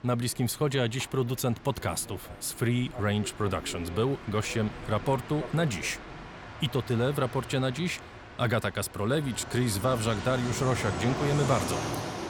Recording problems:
train or aircraft noise; loud; throughout; 9 dB below the speech

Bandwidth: 17.5 kHz